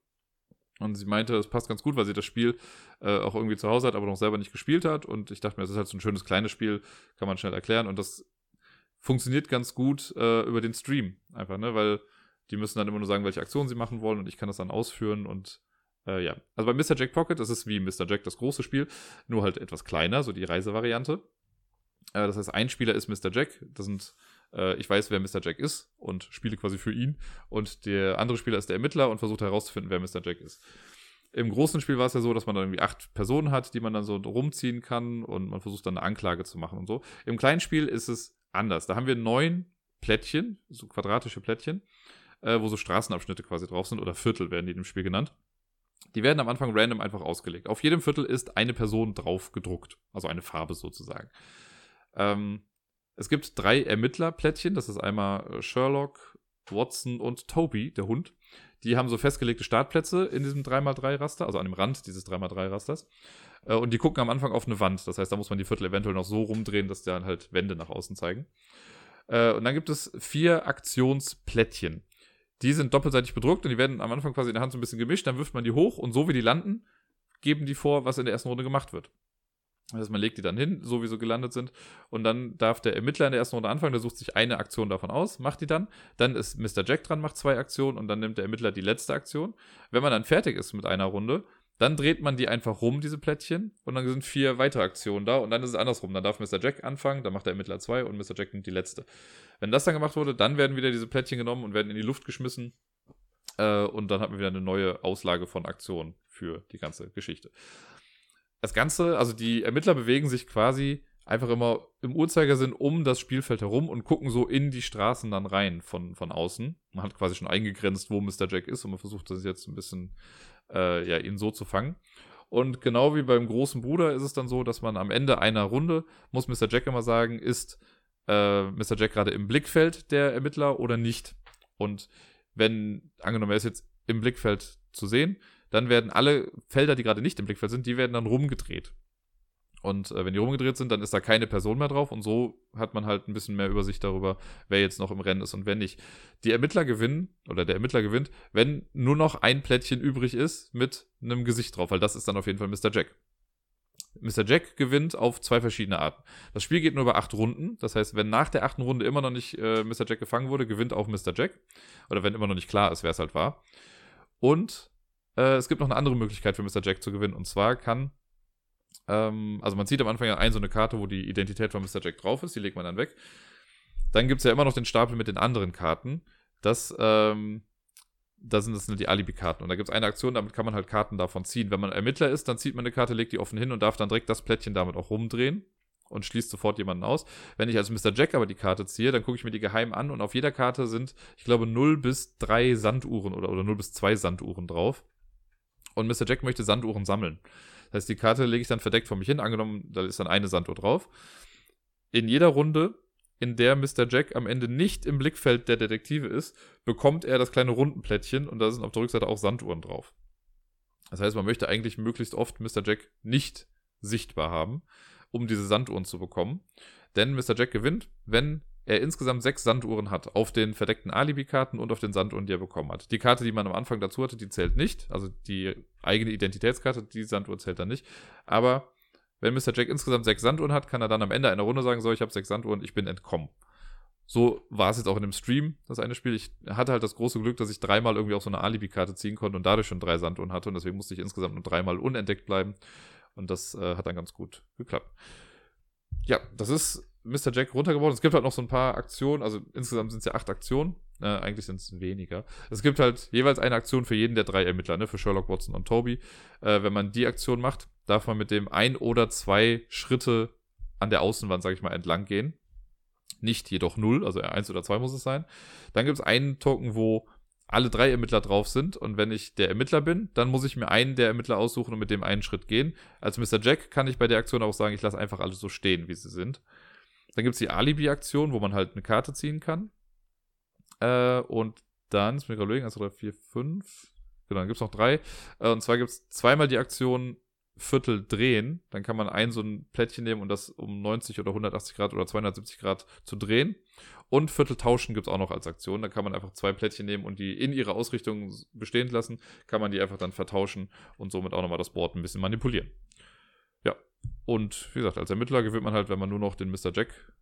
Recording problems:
uneven, jittery; strongly; from 1 s to 4:13

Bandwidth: 17.5 kHz